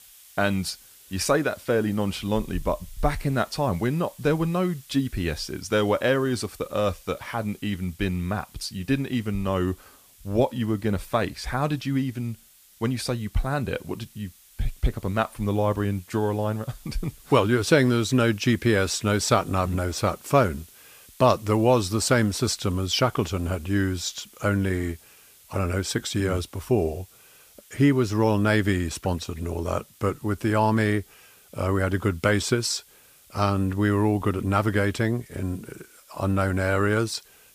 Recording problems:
hiss; faint; throughout; 25 dB below the speech

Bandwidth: 15 kHz